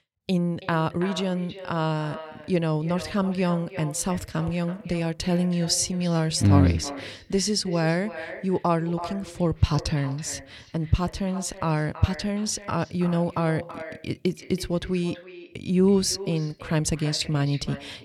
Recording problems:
echo of what is said; noticeable; throughout; 330 ms later, 15 dB below the speech

